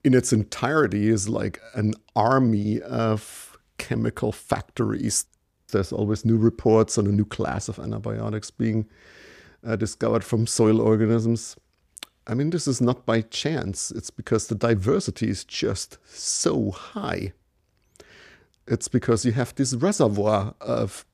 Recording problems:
none

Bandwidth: 15 kHz